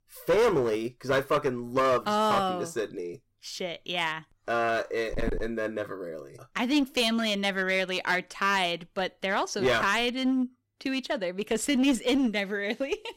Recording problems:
distortion; slight; 8% of the sound clipped

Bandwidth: 16 kHz